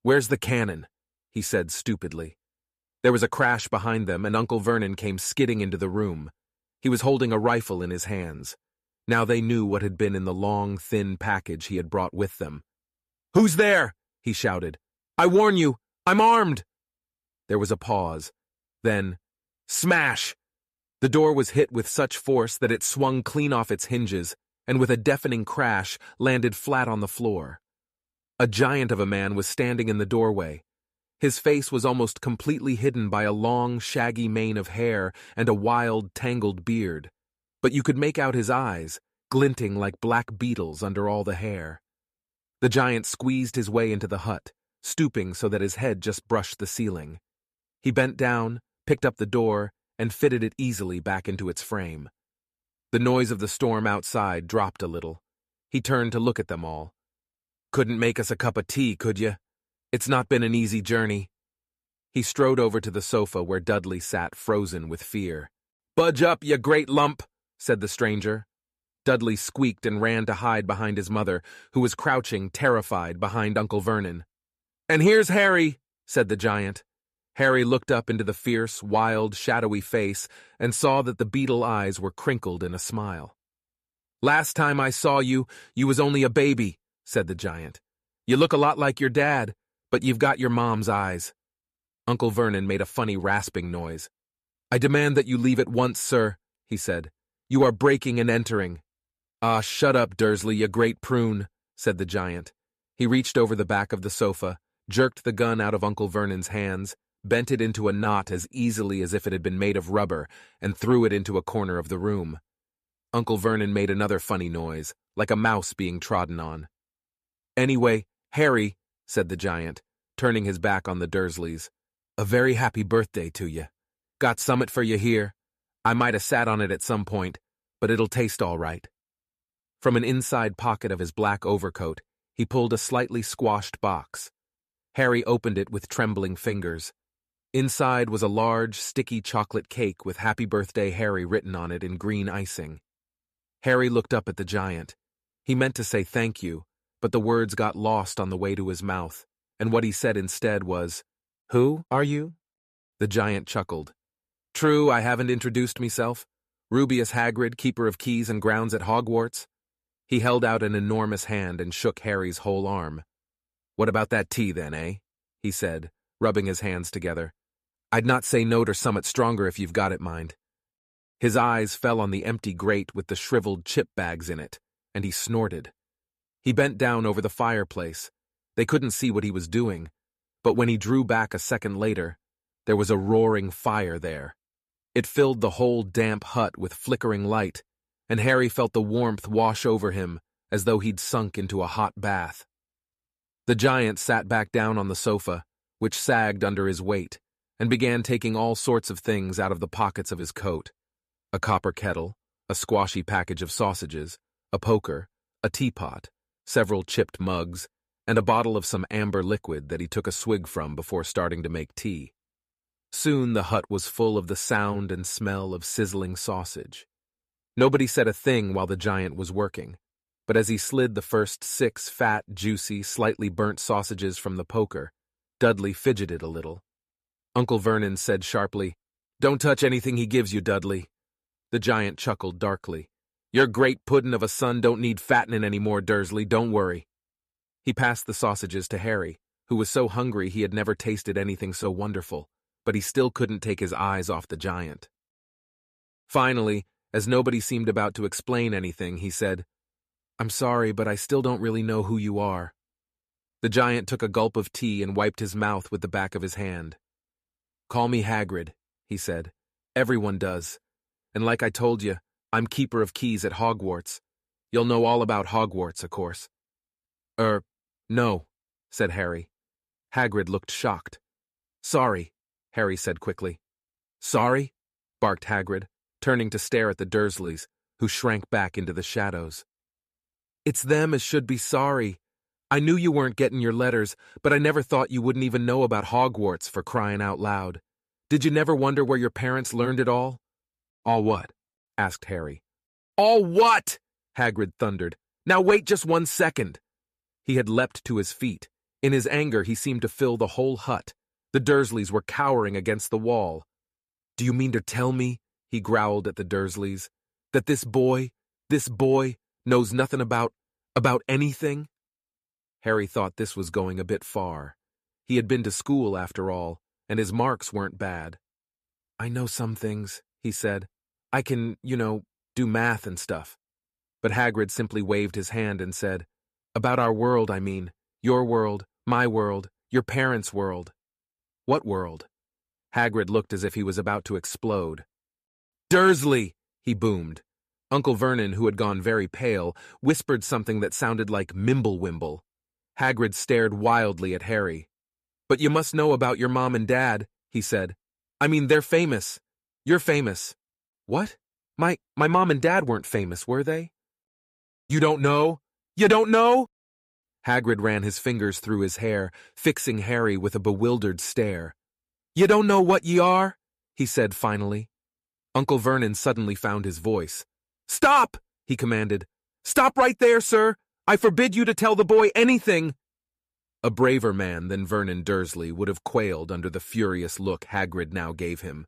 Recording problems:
none

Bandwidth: 14.5 kHz